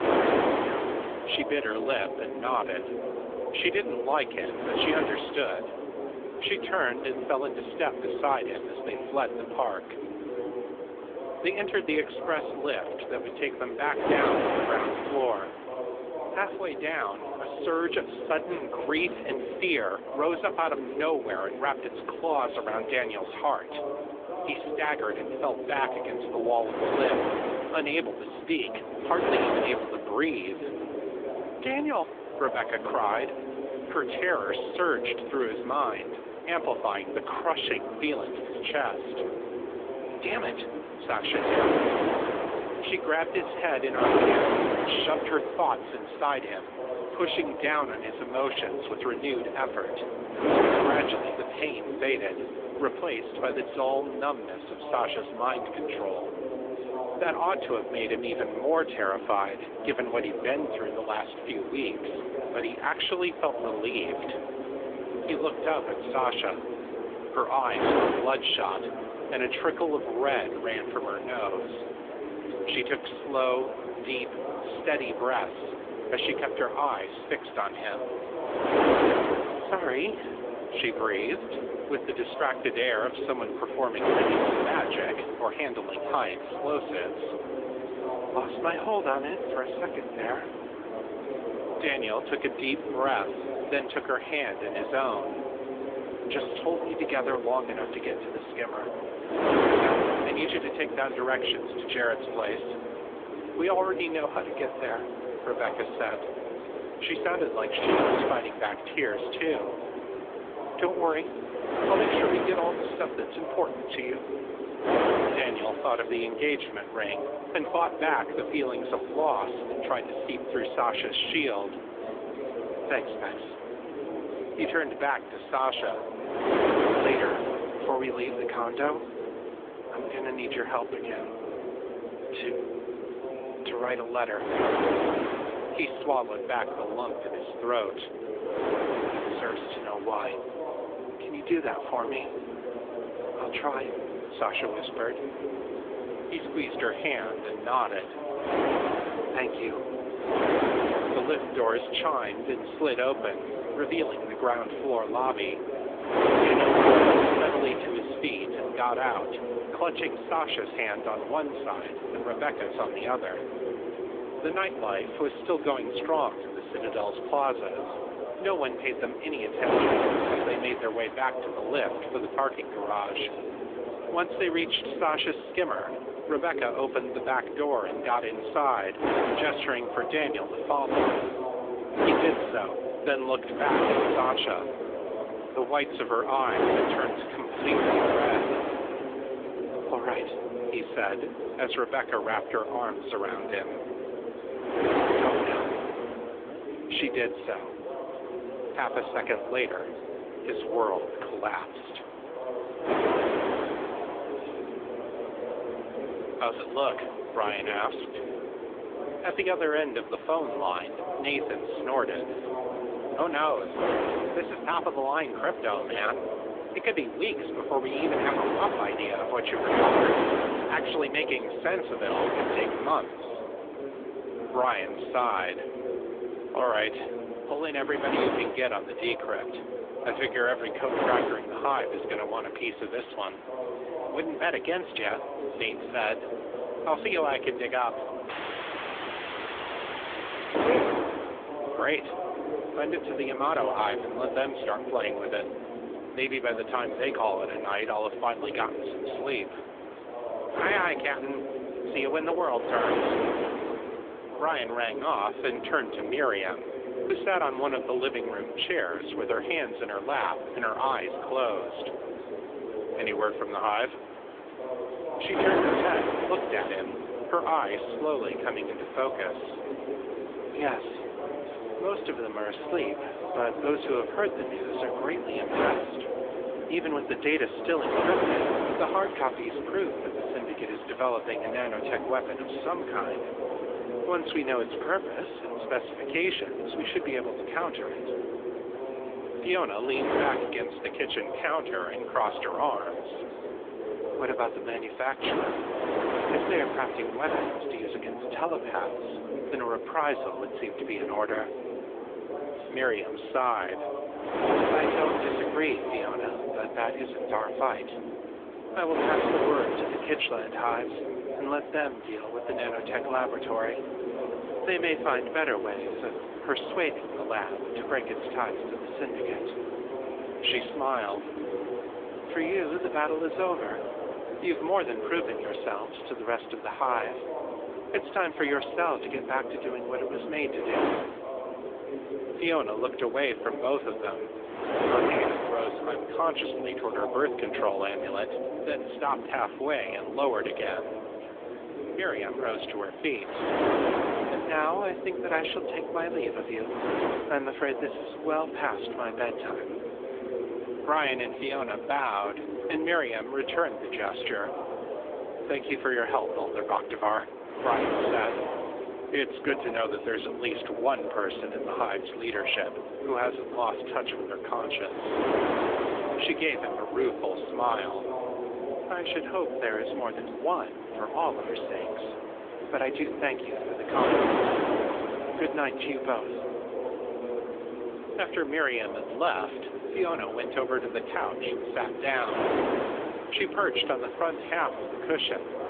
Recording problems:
phone-call audio; nothing above 3.5 kHz
wind noise on the microphone; heavy; 4 dB below the speech
background chatter; loud; throughout; 2 voices, 6 dB below the speech
audio cutting out; at 3:58 for 2.5 s

